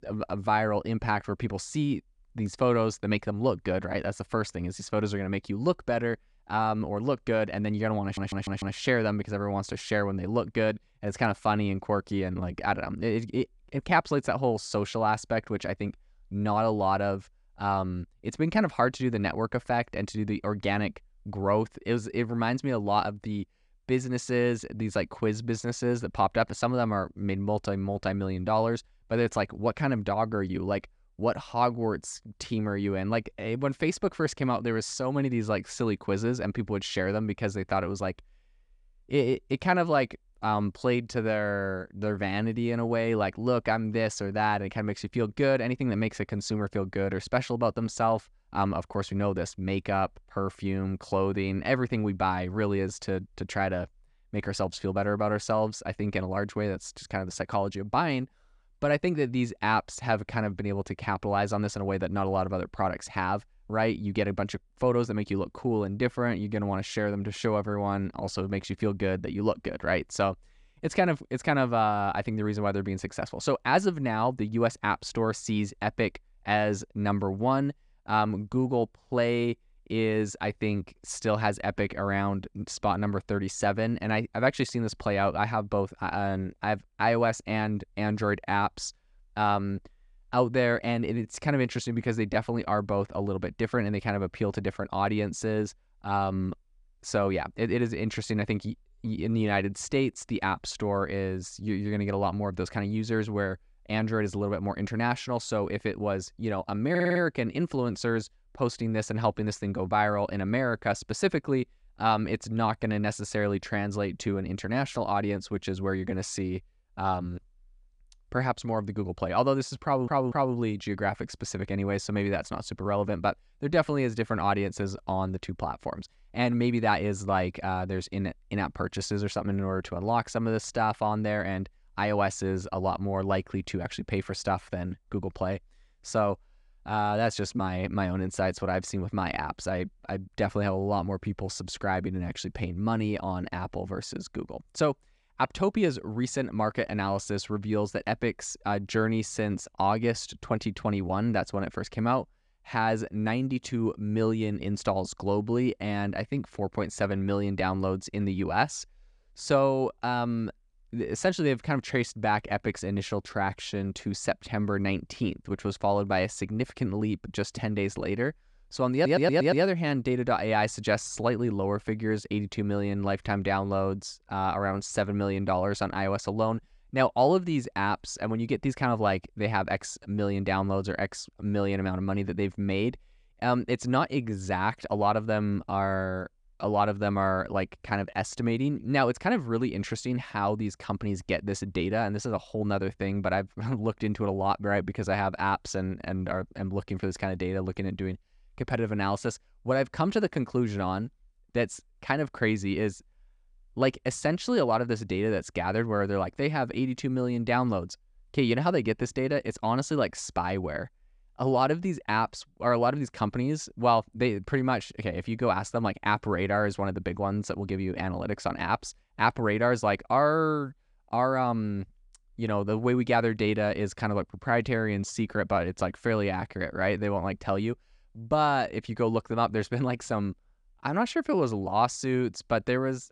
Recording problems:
audio stuttering; 4 times, first at 8 s

